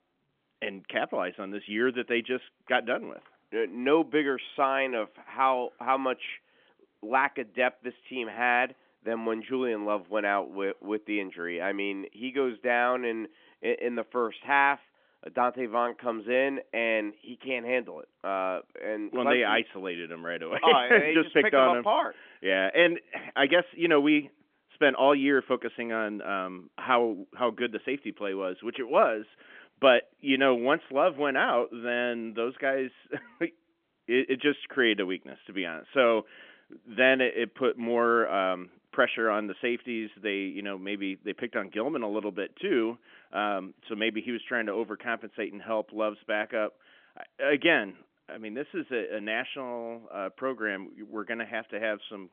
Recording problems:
phone-call audio; nothing above 3.5 kHz

